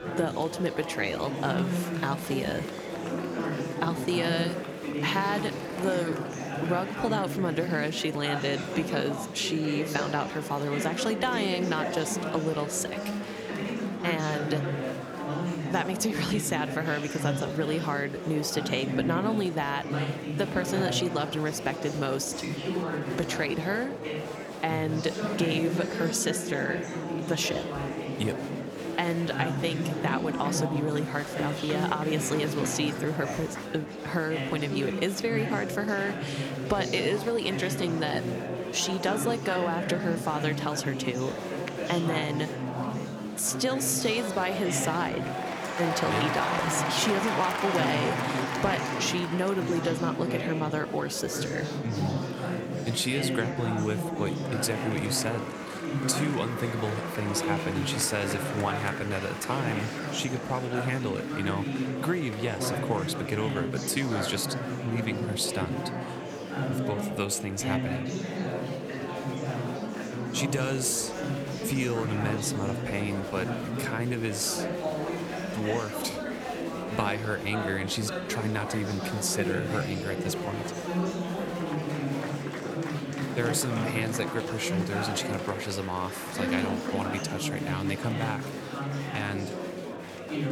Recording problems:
murmuring crowd; loud; throughout; 2 dB below the speech

